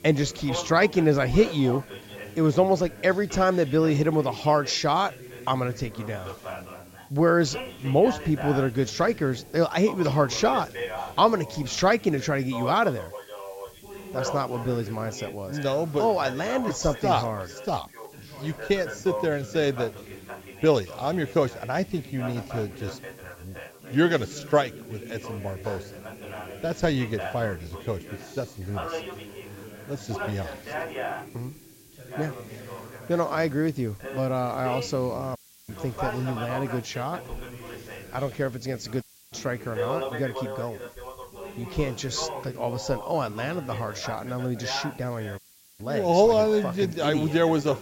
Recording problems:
high frequencies cut off; noticeable; nothing above 8 kHz
background chatter; noticeable; throughout; 2 voices, 10 dB below the speech
hiss; faint; throughout; 25 dB below the speech
audio cutting out; at 35 s, at 39 s and at 45 s

